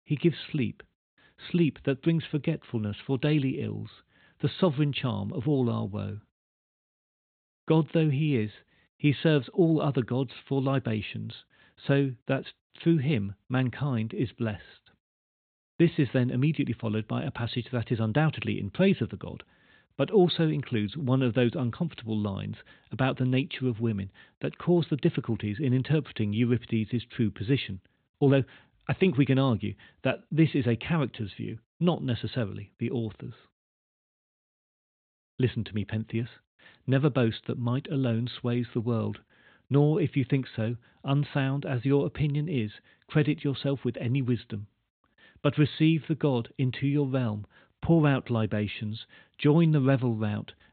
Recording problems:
high frequencies cut off; severe; nothing above 4 kHz

